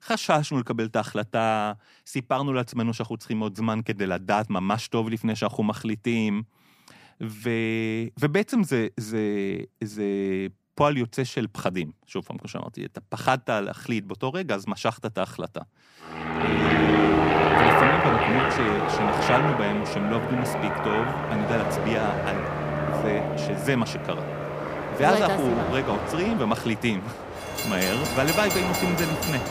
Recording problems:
train or aircraft noise; very loud; from 16 s on; 2 dB above the speech

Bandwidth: 15 kHz